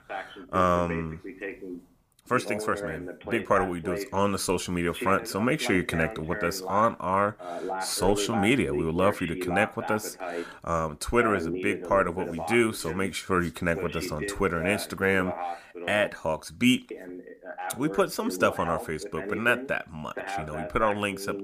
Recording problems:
voice in the background; loud; throughout; 9 dB below the speech

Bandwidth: 15 kHz